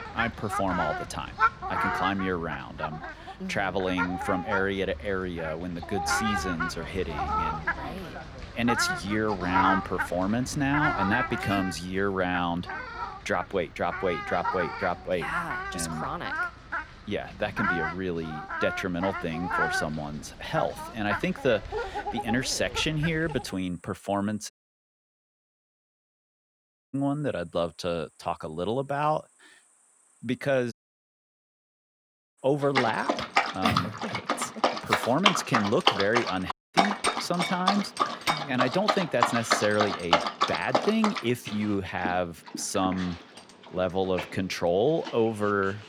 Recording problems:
animal sounds; loud; throughout; 1 dB below the speech
audio cutting out; at 25 s for 2.5 s, at 31 s for 1.5 s and at 37 s

